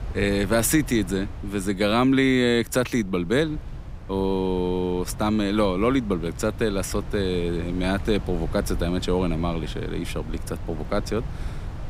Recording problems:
wind noise on the microphone; occasional gusts; 20 dB below the speech

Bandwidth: 15.5 kHz